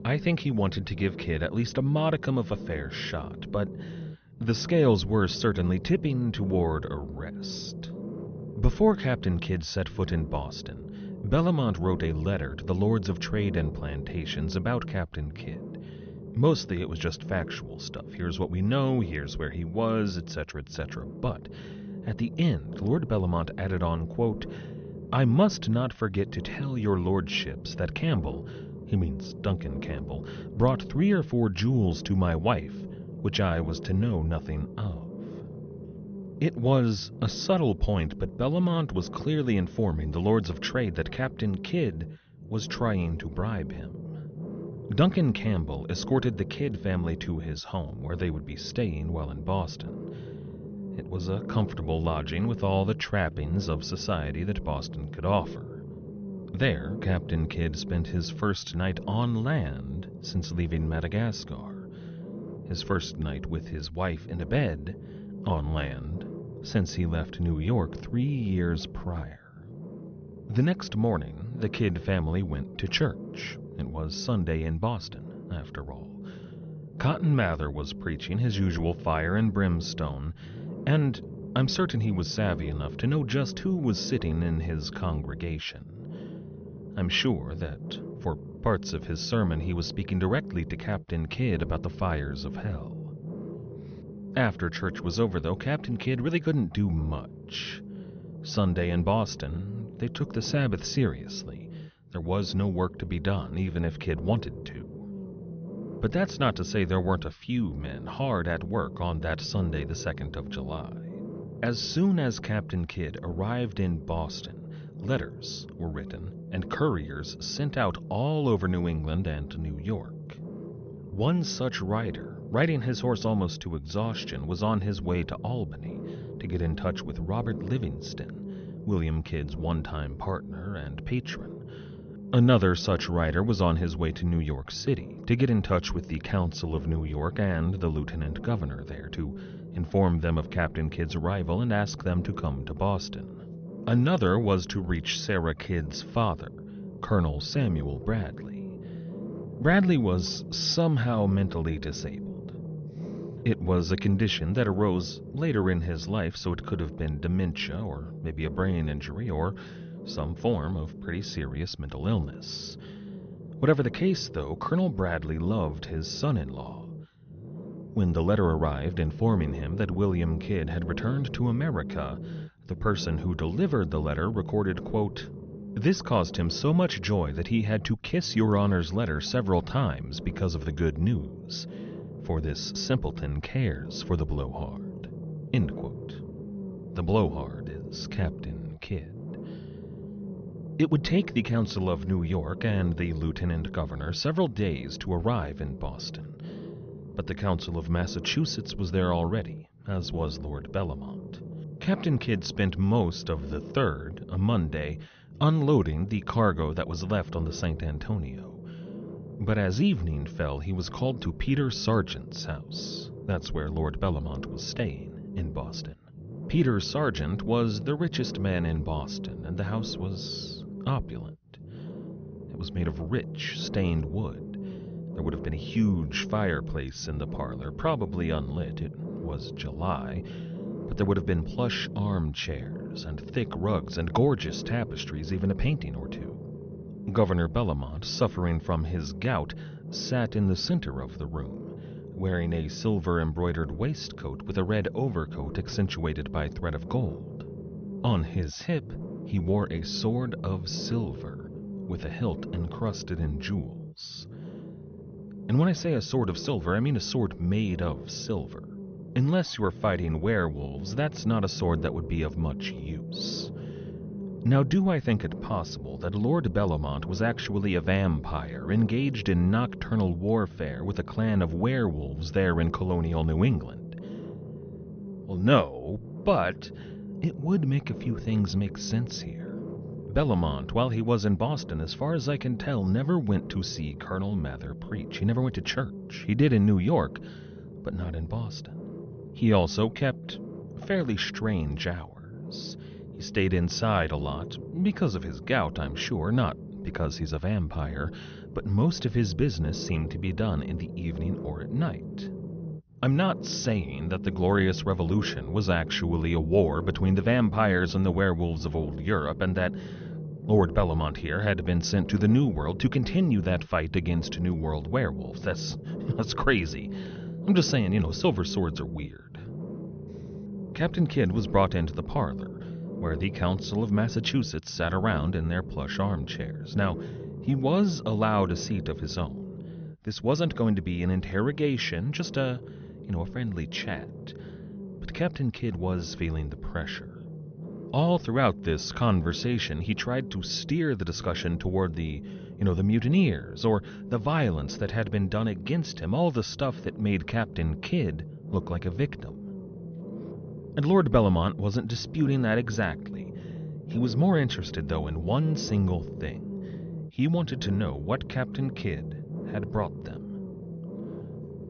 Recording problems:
high frequencies cut off; noticeable; nothing above 6 kHz
low rumble; noticeable; throughout; 15 dB below the speech

